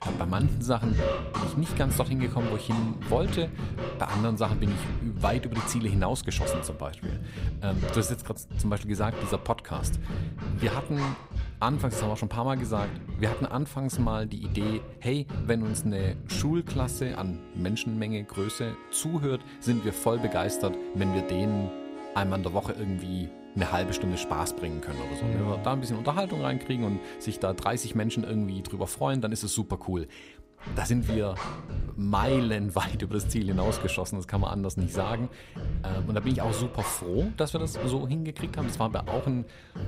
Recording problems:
background music; loud; throughout; 5 dB below the speech

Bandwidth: 15.5 kHz